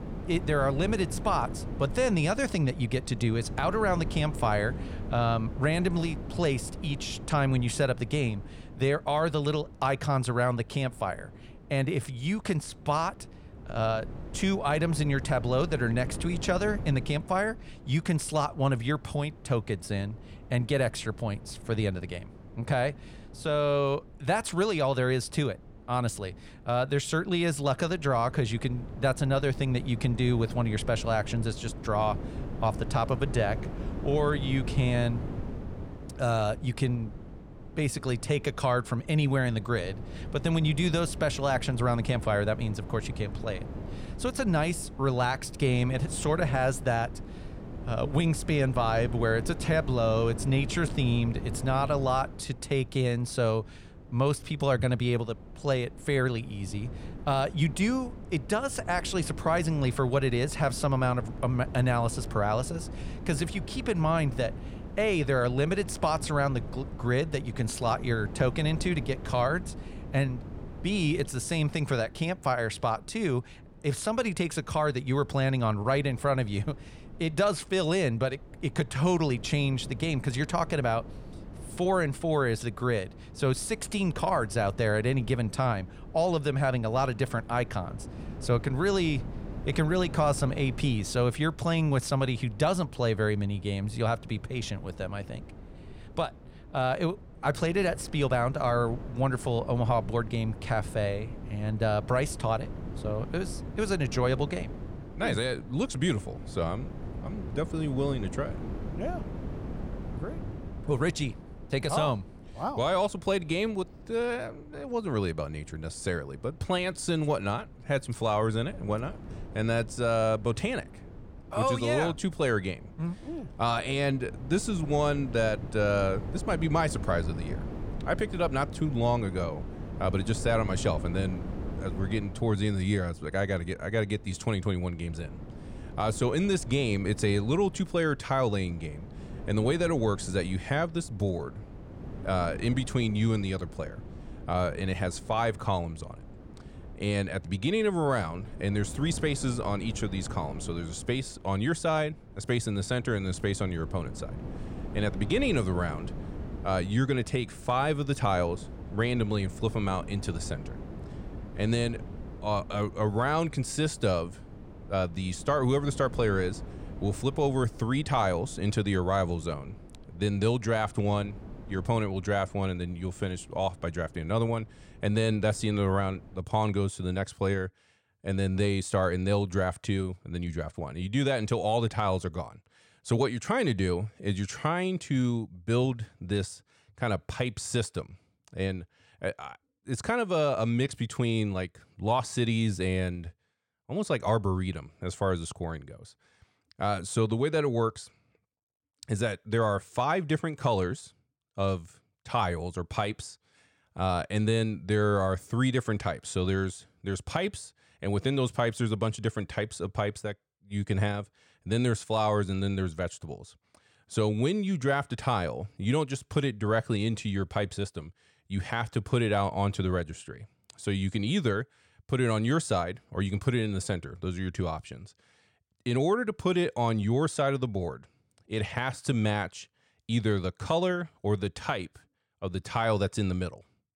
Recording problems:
wind noise on the microphone; occasional gusts; until 2:56; 20 dB below the speech

